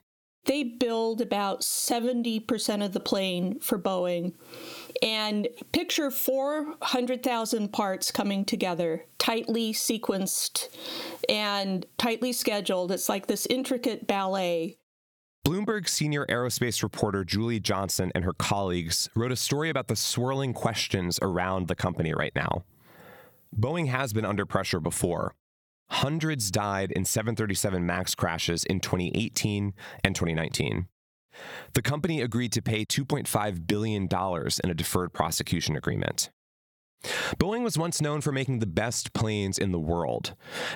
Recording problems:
squashed, flat; somewhat

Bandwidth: 18.5 kHz